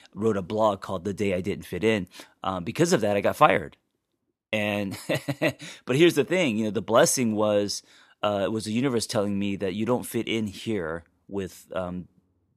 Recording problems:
none

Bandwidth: 14 kHz